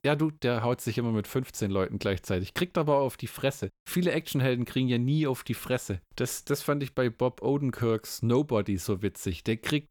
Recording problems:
none

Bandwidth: 18.5 kHz